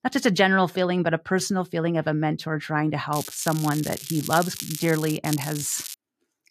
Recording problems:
crackling; loud; from 3 to 5 s and at 5 s; 9 dB below the speech

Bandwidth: 14.5 kHz